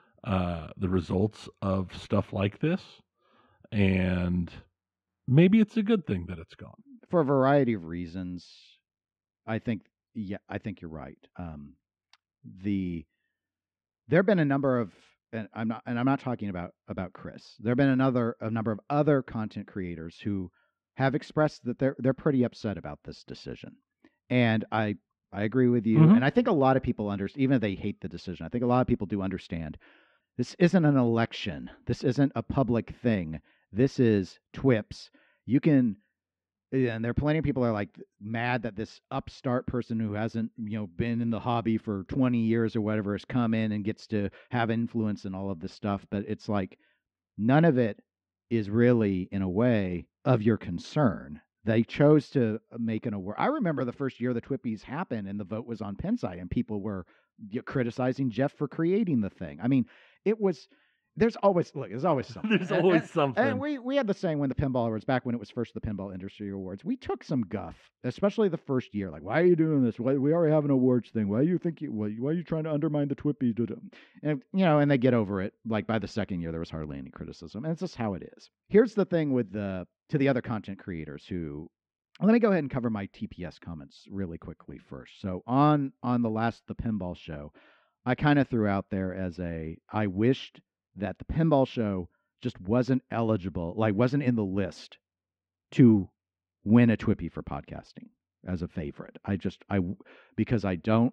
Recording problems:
muffled; very; fading above 2.5 kHz

